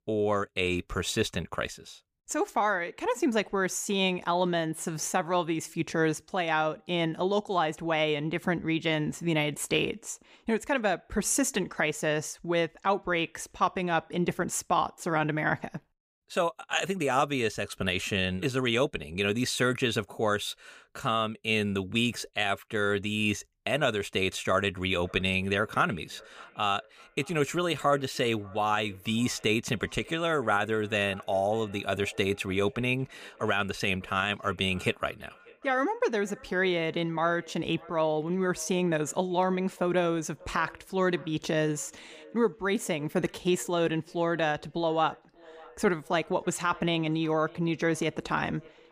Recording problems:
echo of what is said; faint; from 25 s on; 590 ms later, 25 dB below the speech

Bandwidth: 15 kHz